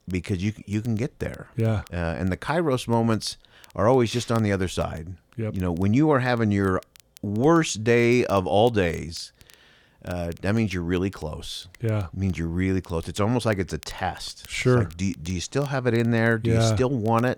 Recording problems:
crackle, like an old record; faint; 30 dB below the speech

